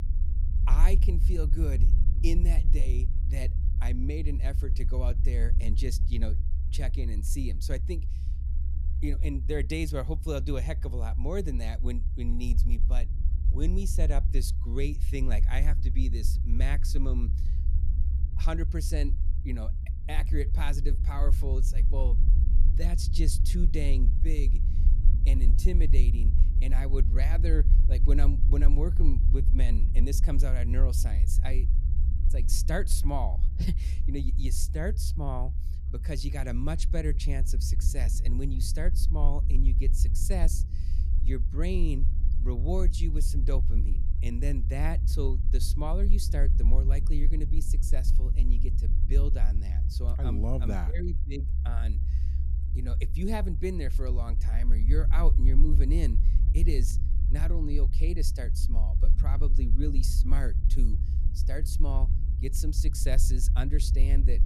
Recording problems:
low rumble; loud; throughout; 9 dB below the speech

